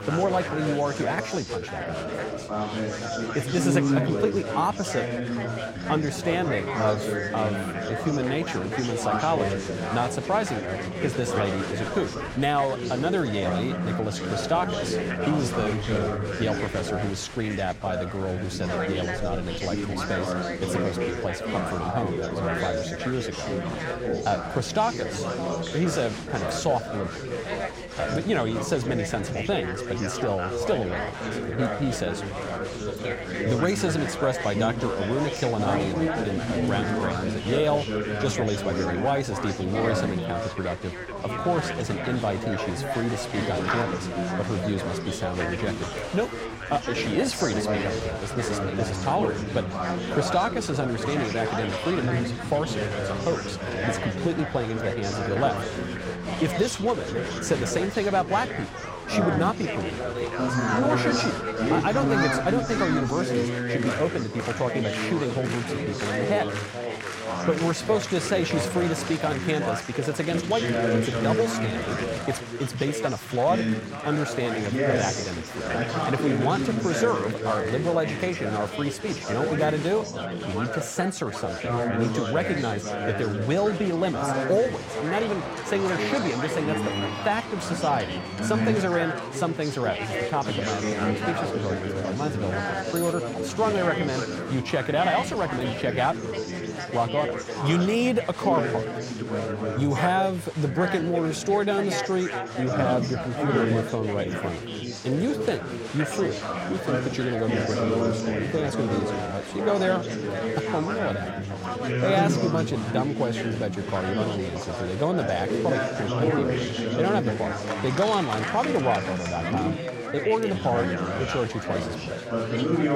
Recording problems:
chatter from many people; loud; throughout; 1 dB below the speech

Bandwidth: 16.5 kHz